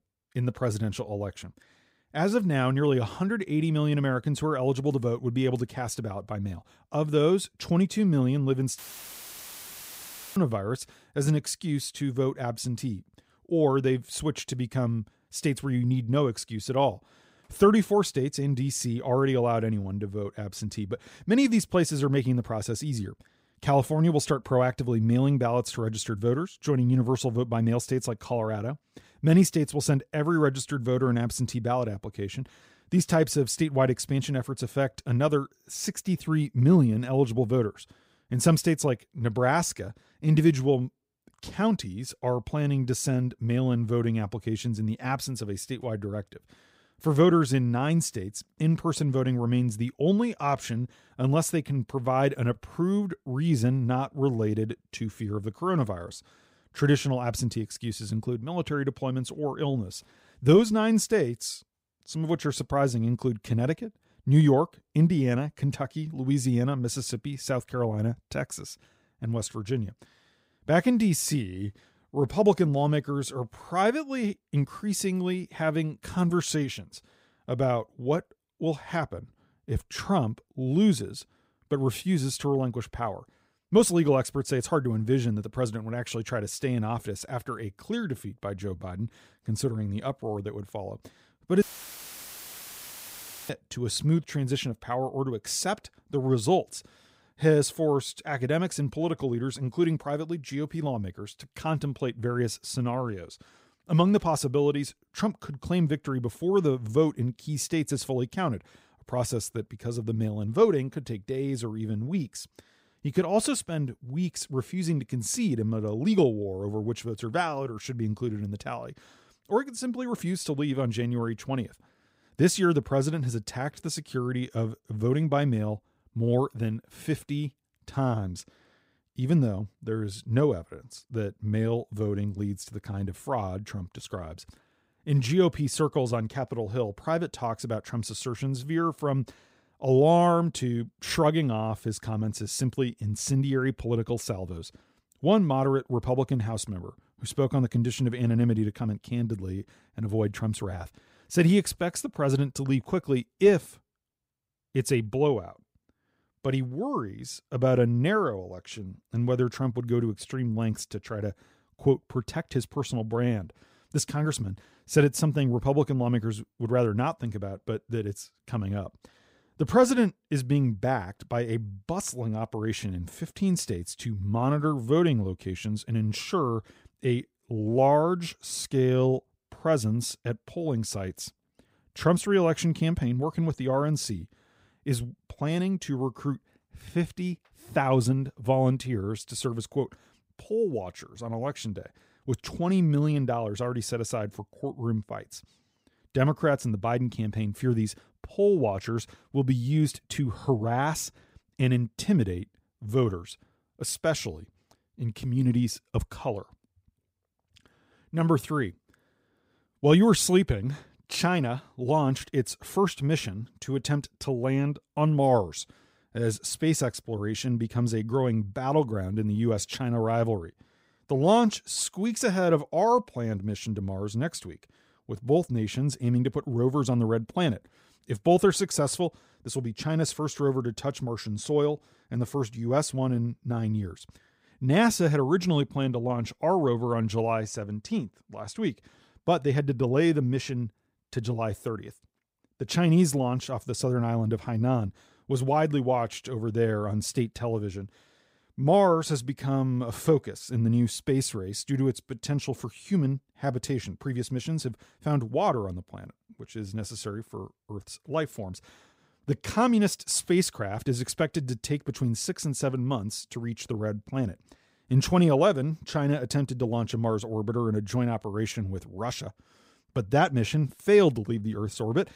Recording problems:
audio cutting out; filled with static; at 9 s for 1.5 s and at 1:32 for 2 s

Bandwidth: 15.5 kHz